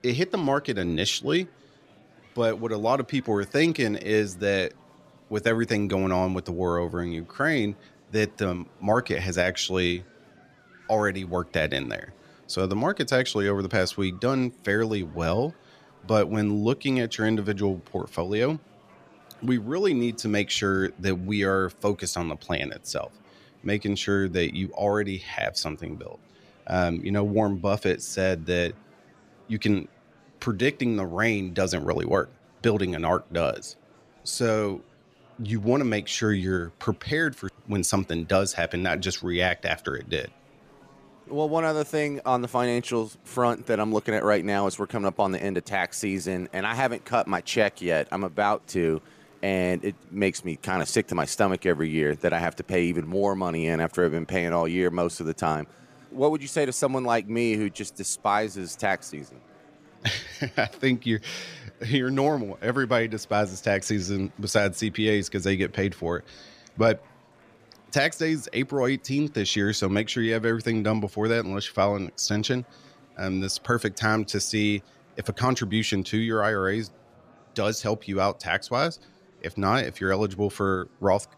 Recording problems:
murmuring crowd; faint; throughout; 30 dB below the speech

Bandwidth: 14.5 kHz